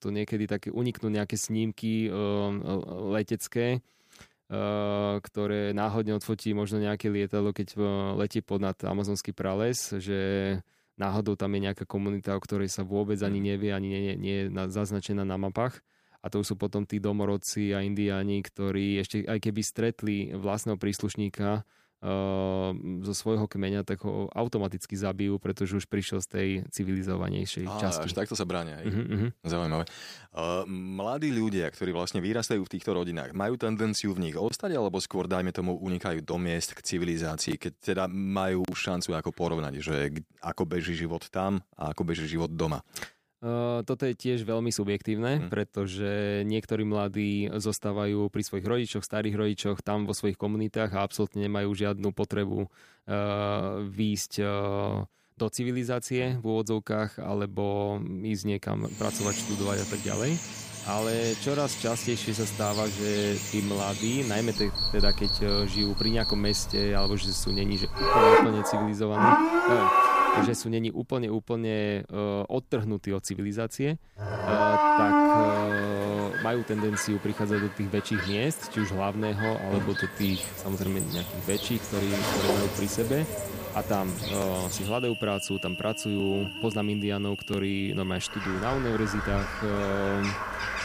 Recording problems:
animal sounds; very loud; from 59 s on; 2 dB above the speech

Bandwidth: 15 kHz